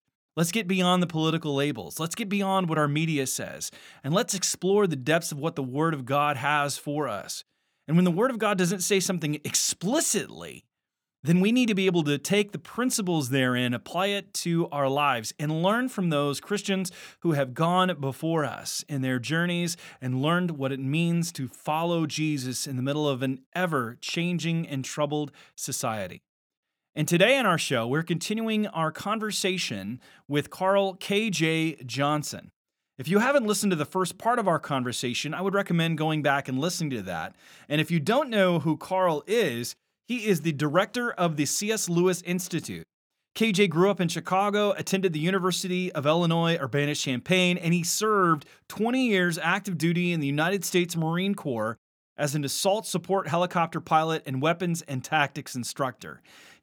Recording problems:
none

